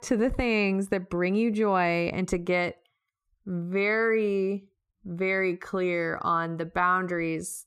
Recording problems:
none

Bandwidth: 14.5 kHz